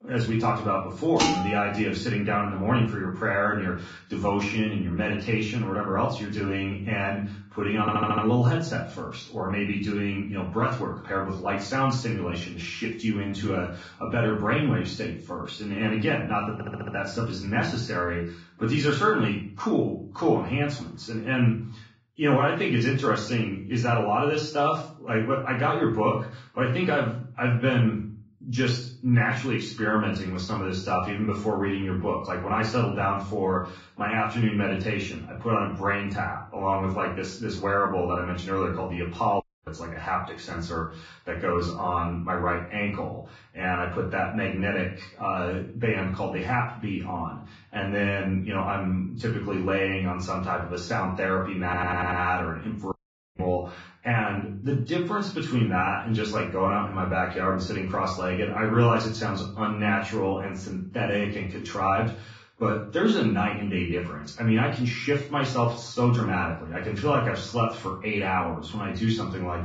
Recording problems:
off-mic speech; far
garbled, watery; badly; nothing above 7.5 kHz
room echo; slight; dies away in 0.4 s
clattering dishes; loud; at 1 s; peak 2 dB above the speech
audio stuttering; at 8 s, at 17 s and at 52 s
audio cutting out; at 39 s and at 53 s

